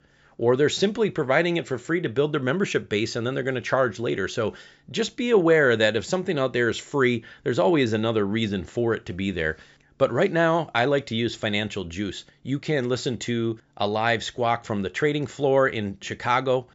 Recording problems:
high frequencies cut off; noticeable; nothing above 8 kHz

